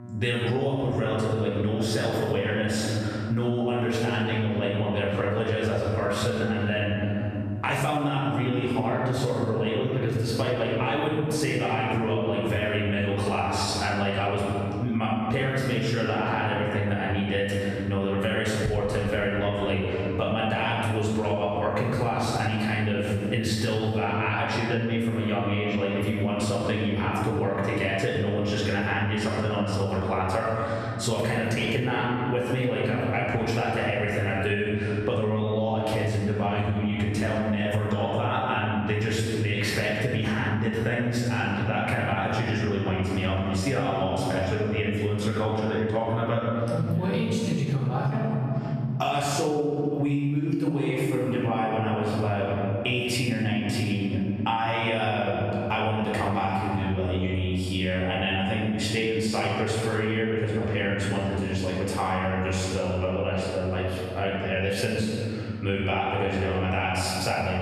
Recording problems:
room echo; strong; dies away in 2.1 s
off-mic speech; far
squashed, flat; somewhat
electrical hum; faint; throughout; 60 Hz, 25 dB below the speech

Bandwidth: 14 kHz